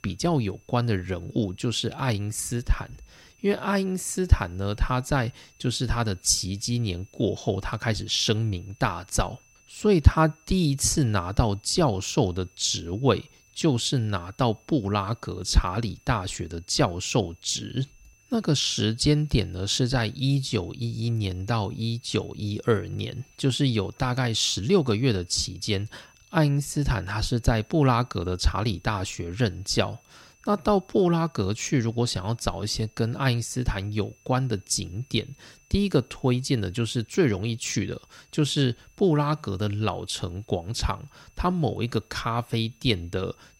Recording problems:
high-pitched whine; faint; throughout; 2.5 kHz, 35 dB below the speech

